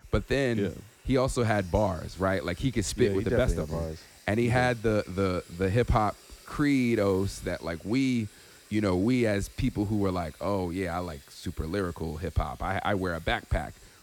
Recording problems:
household noises; faint; throughout; 25 dB below the speech

